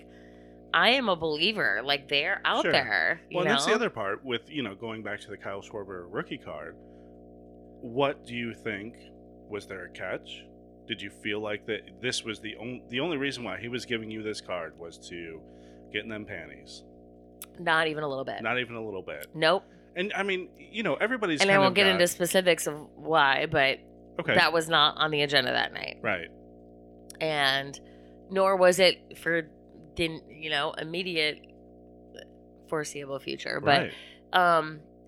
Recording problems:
electrical hum; faint; throughout; 60 Hz, 30 dB below the speech

